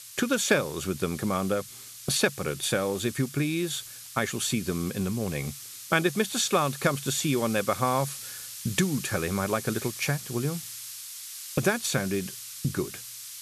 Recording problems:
hiss; noticeable; throughout; 10 dB below the speech

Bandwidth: 13.5 kHz